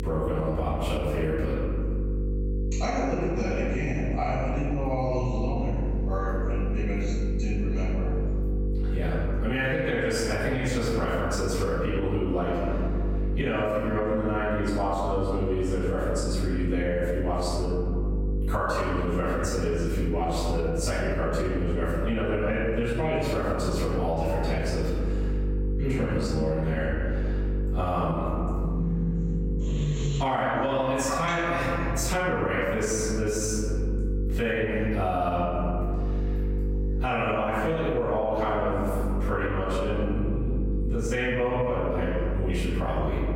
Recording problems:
room echo; strong; dies away in 1.5 s
off-mic speech; far
squashed, flat; heavily
electrical hum; noticeable; throughout; 50 Hz, 15 dB below the speech

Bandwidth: 16.5 kHz